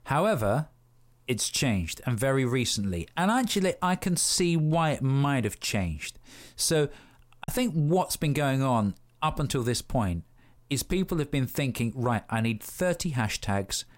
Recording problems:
choppy; occasionally; at 7.5 s; 1% of the speech affected

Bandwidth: 16 kHz